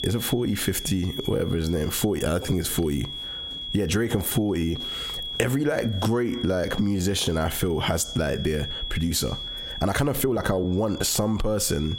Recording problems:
squashed, flat; heavily
high-pitched whine; noticeable; throughout; 3.5 kHz, 10 dB below the speech
uneven, jittery; strongly; from 1 to 11 s

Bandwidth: 16 kHz